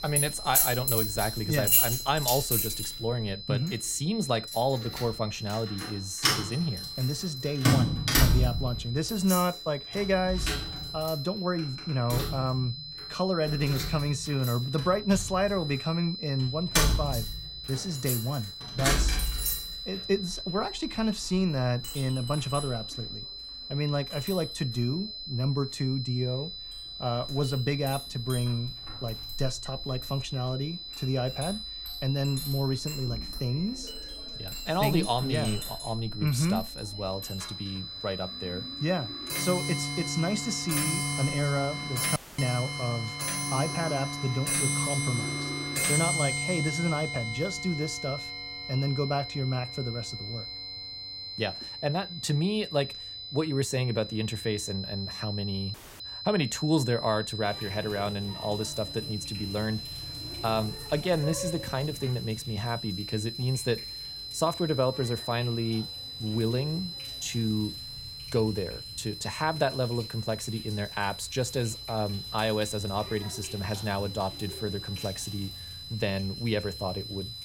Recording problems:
high-pitched whine; loud; throughout; 4 kHz, 7 dB below the speech
household noises; loud; throughout; 1 dB below the speech
audio cutting out; filled with static; at 42 s and at 56 s

